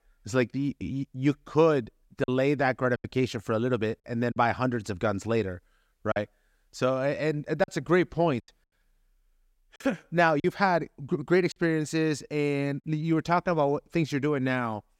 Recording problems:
choppy; occasionally; 3% of the speech affected

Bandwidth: 16 kHz